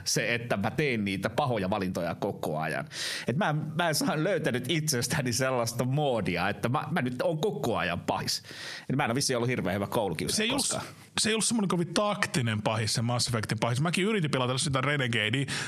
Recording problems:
squashed, flat; heavily
uneven, jittery; strongly; from 0.5 to 15 s

